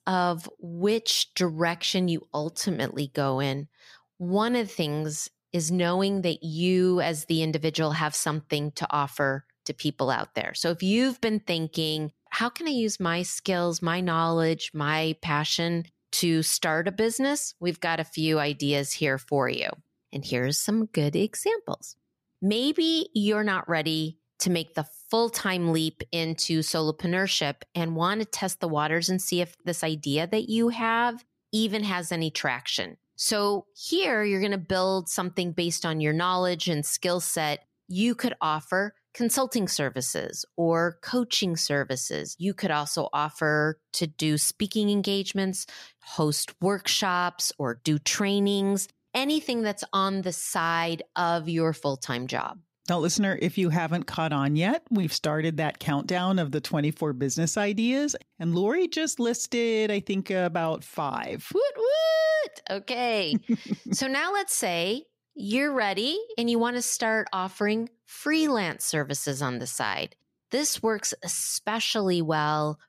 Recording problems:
none

